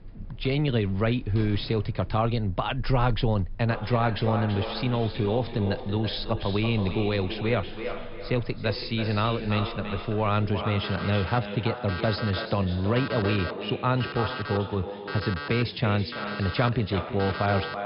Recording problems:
echo of what is said; strong; from 3.5 s on; 330 ms later, 9 dB below the speech
high frequencies cut off; noticeable; nothing above 5.5 kHz
alarms or sirens; noticeable; throughout; 15 dB below the speech

